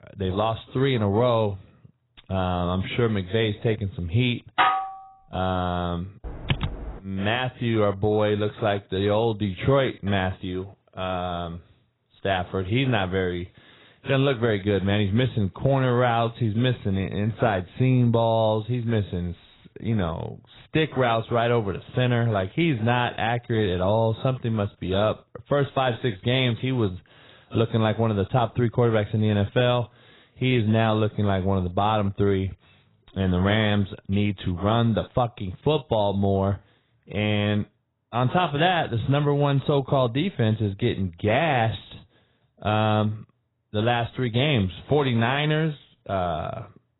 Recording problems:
garbled, watery; badly; nothing above 4 kHz
clattering dishes; loud; at 4.5 s; peak 3 dB above the speech
keyboard typing; noticeable; at 6.5 s; peak 4 dB below the speech

